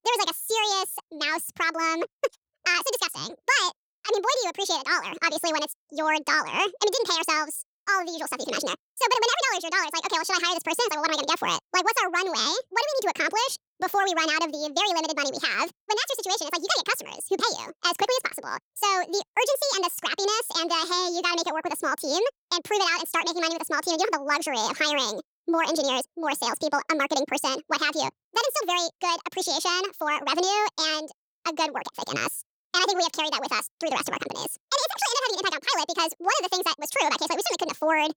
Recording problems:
wrong speed and pitch; too fast and too high; 1.7 times normal speed

